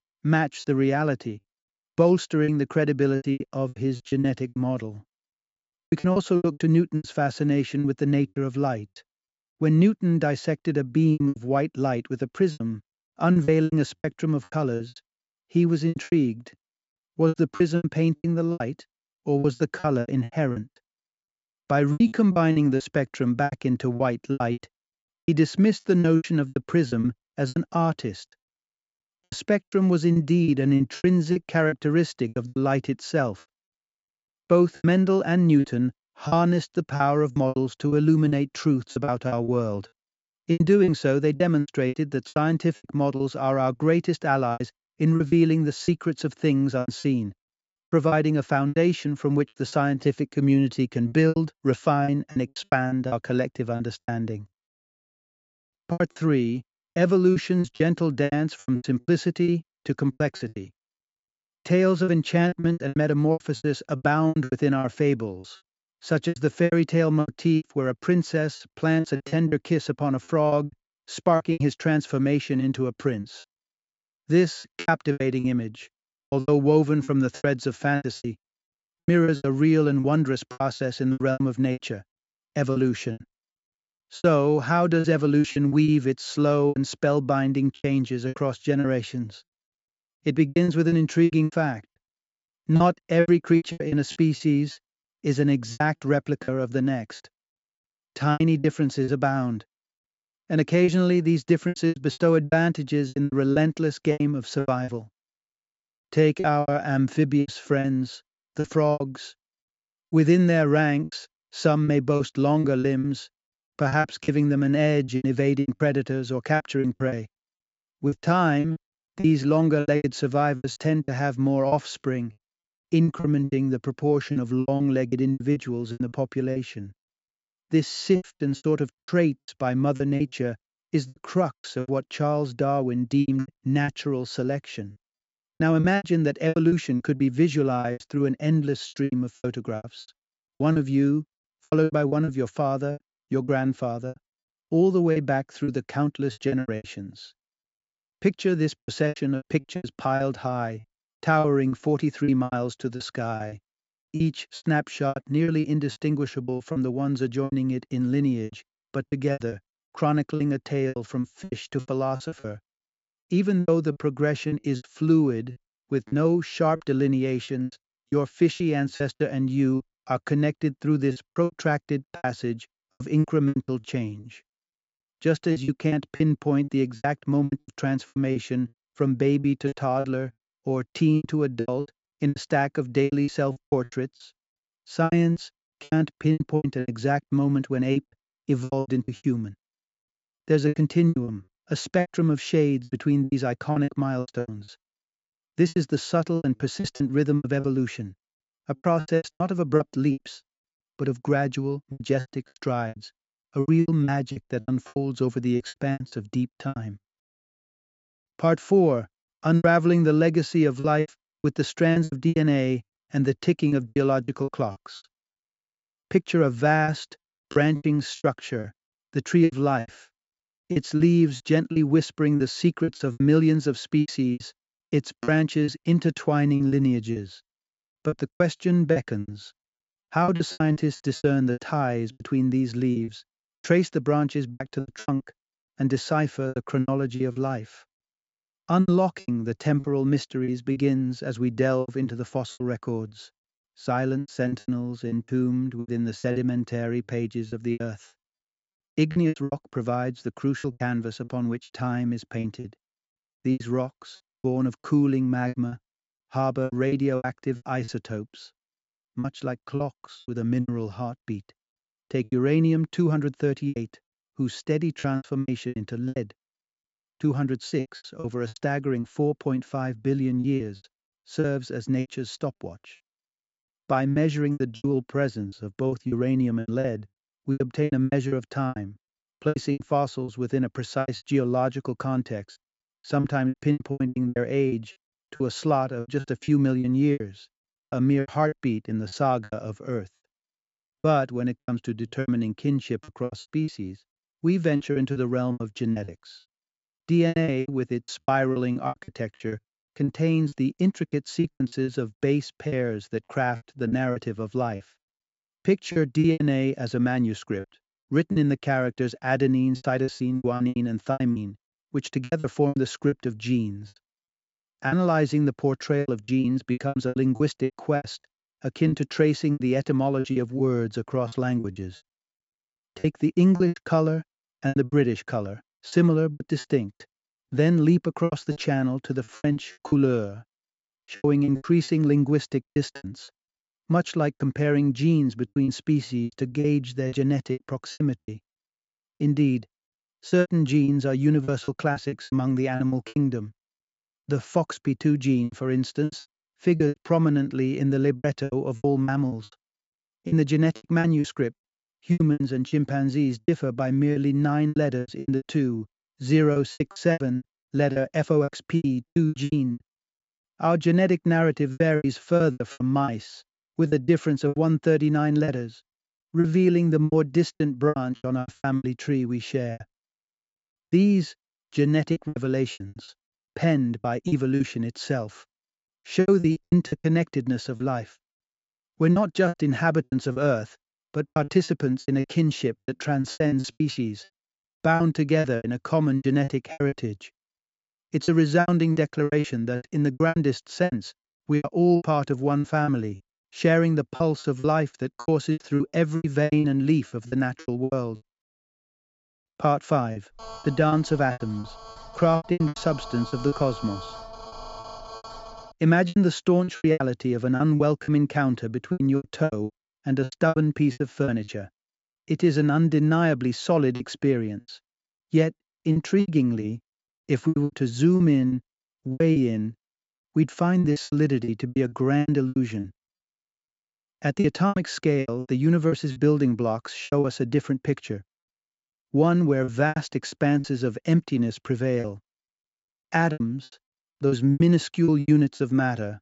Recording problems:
high frequencies cut off; noticeable; nothing above 8 kHz
choppy; very; 15% of the speech affected
phone ringing; faint; from 6:40 to 6:46; peak 15 dB below the speech

